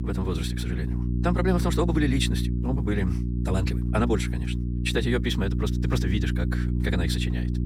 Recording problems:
wrong speed, natural pitch; too fast; 1.6 times normal speed
electrical hum; loud; throughout; 60 Hz, 7 dB below the speech

